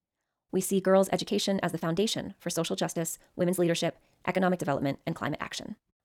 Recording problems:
wrong speed, natural pitch; too fast; 1.6 times normal speed

